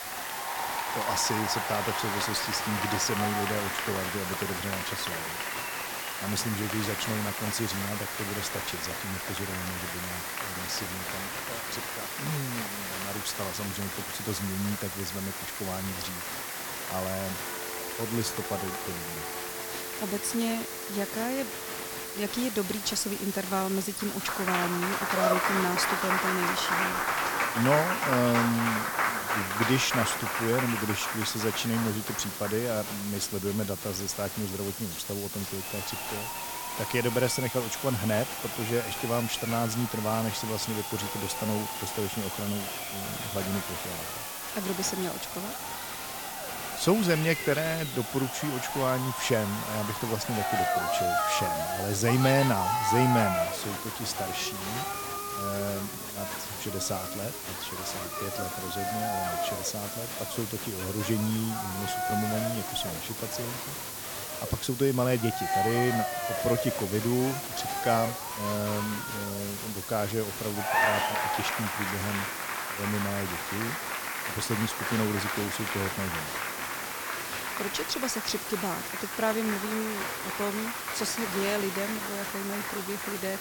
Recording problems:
crowd noise; loud; throughout; 2 dB below the speech
hiss; loud; throughout; 5 dB below the speech
phone ringing; faint; from 17 to 22 s; peak 10 dB below the speech

